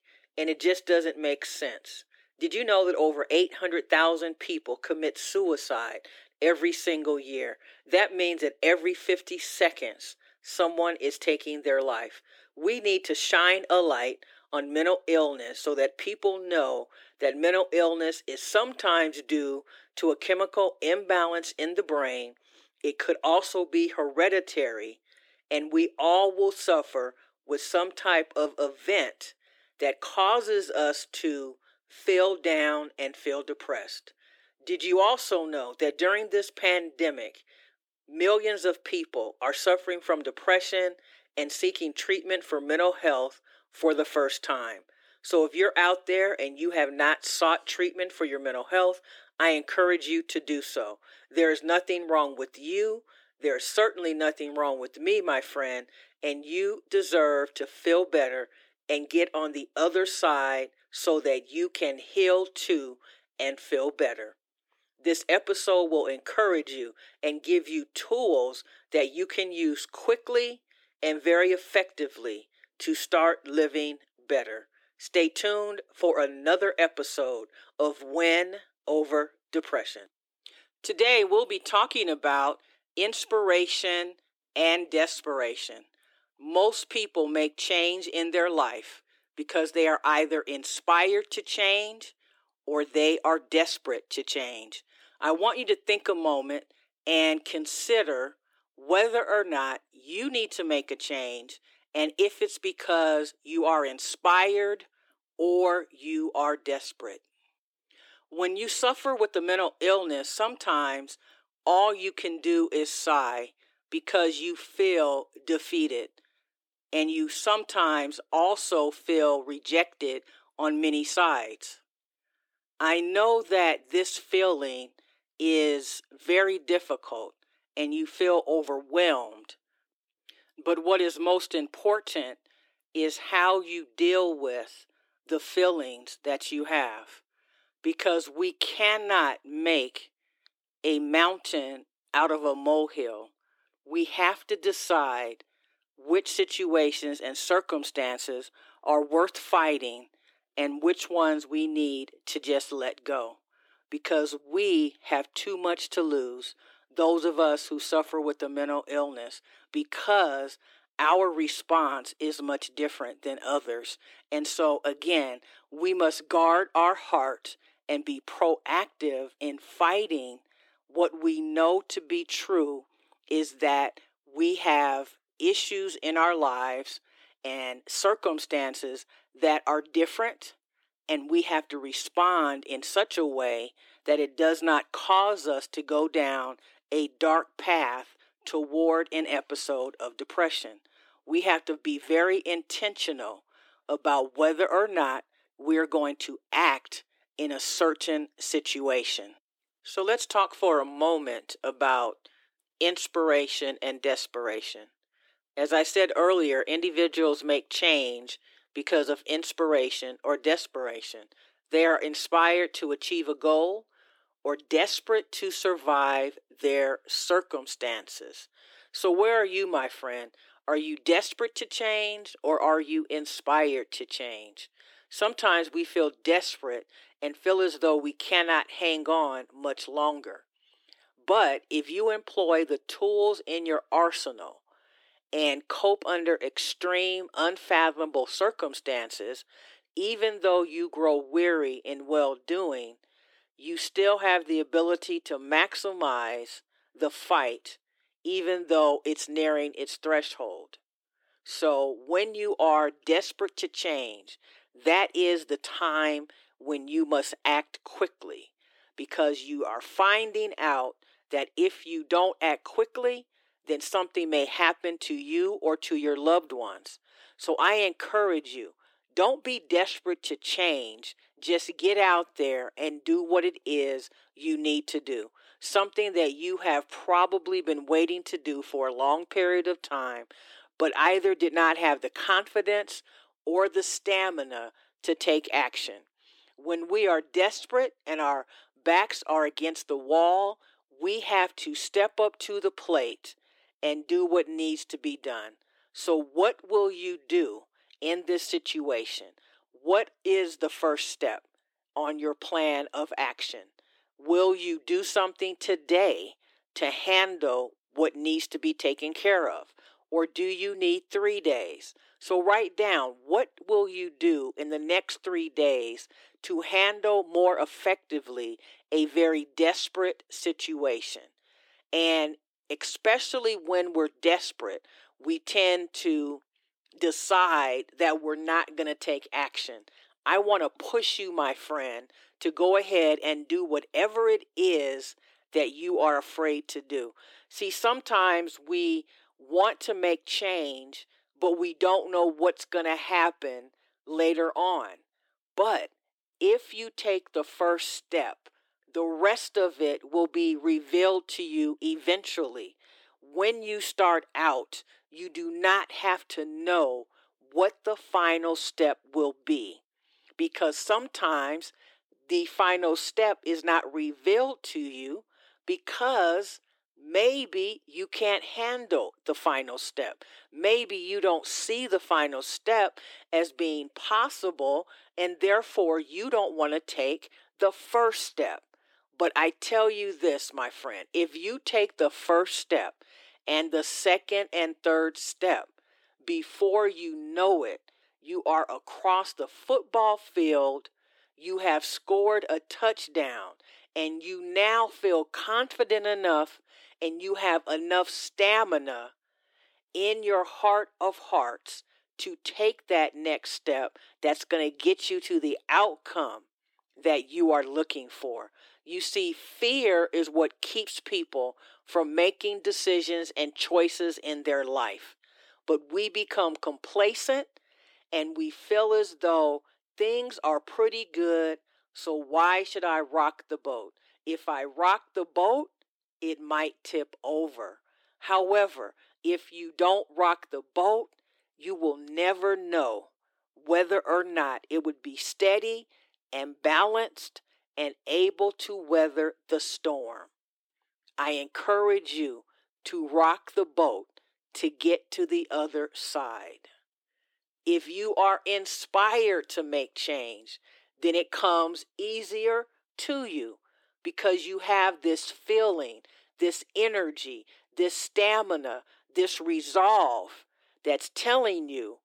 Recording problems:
thin; somewhat; fading below 300 Hz

